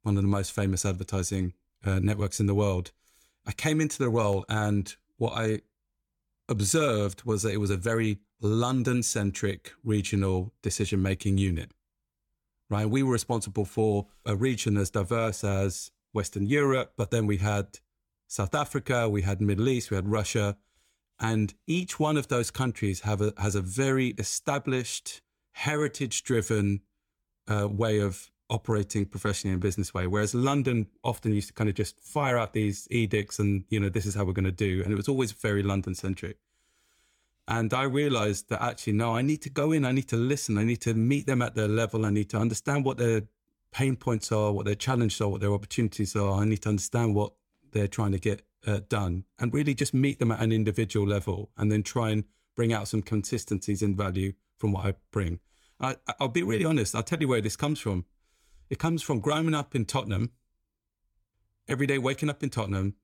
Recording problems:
none

